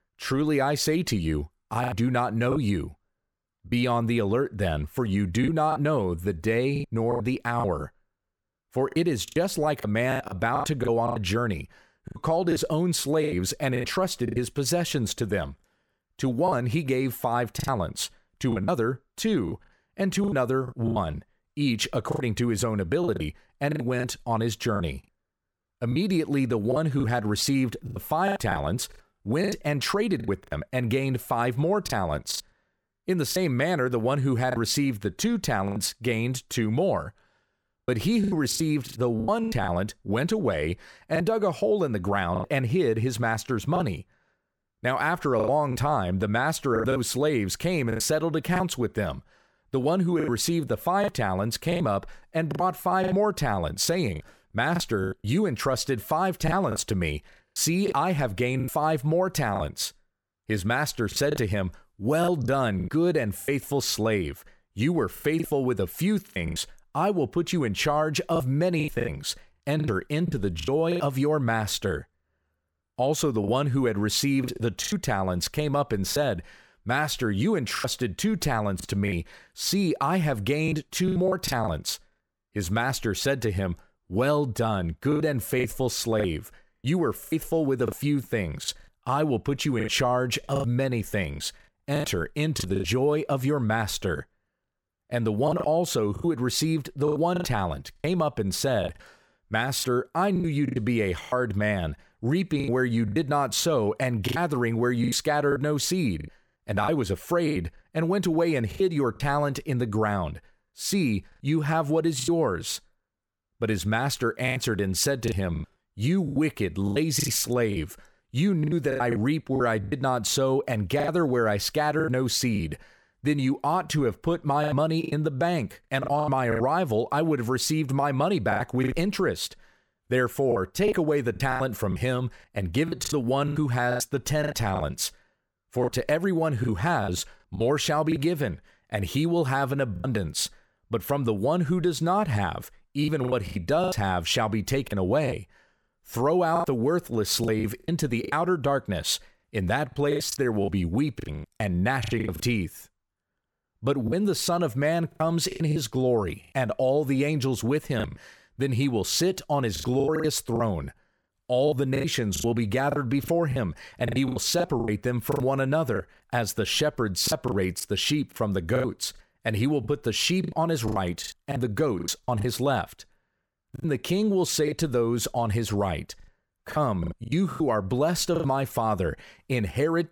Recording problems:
choppy; very; 10% of the speech affected

